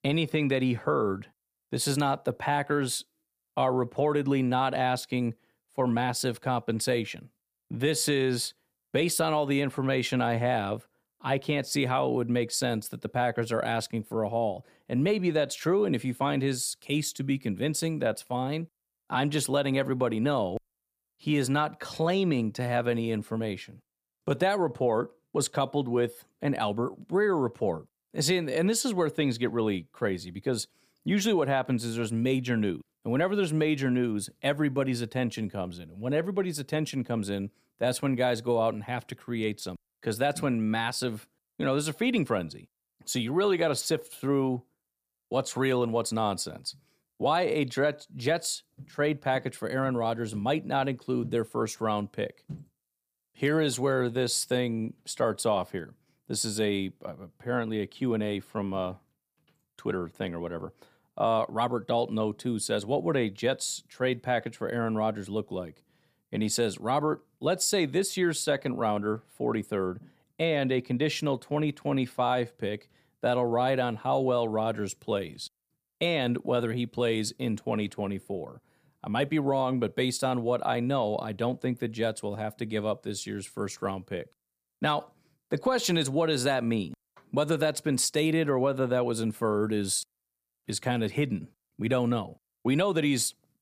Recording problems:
none

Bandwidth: 15 kHz